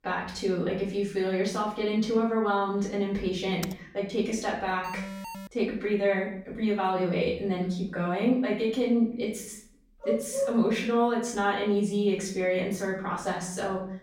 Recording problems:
off-mic speech; far
room echo; noticeable; dies away in 0.5 s
keyboard typing; faint; at 3.5 s; peak 15 dB below the speech
alarm; noticeable; at 5 s; peak 10 dB below the speech
dog barking; noticeable; at 10 s; peak 2 dB below the speech

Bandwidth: 16 kHz